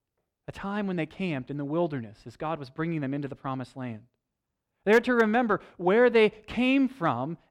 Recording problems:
none

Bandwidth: 18 kHz